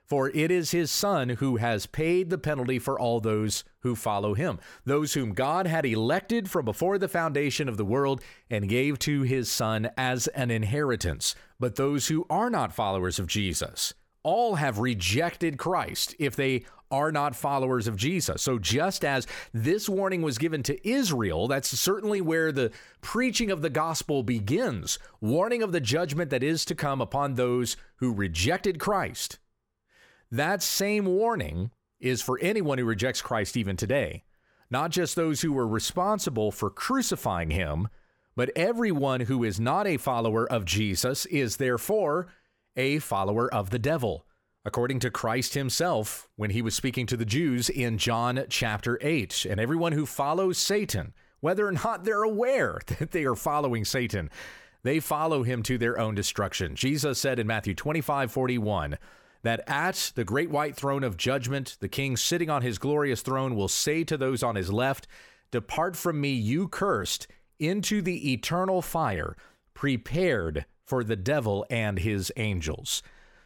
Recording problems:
none

